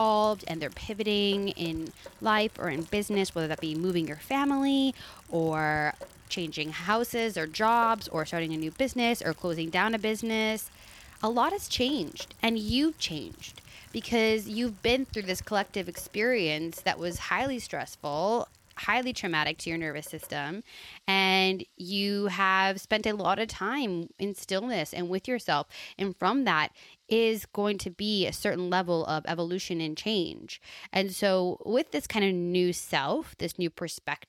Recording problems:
rain or running water; faint; throughout; 20 dB below the speech
abrupt cut into speech; at the start

